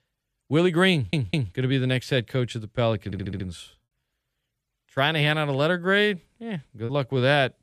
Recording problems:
audio stuttering; at 1 s and at 3 s
choppy; occasionally; at 7 s; 3% of the speech affected

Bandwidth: 14.5 kHz